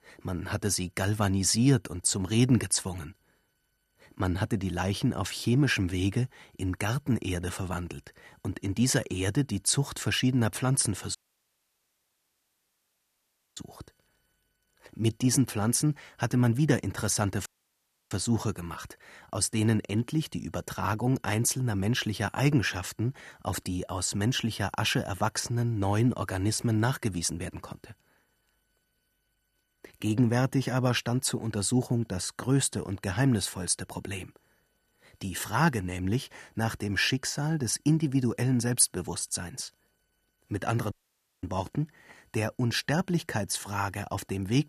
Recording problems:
audio cutting out; at 11 s for 2.5 s, at 17 s for 0.5 s and at 41 s for 0.5 s

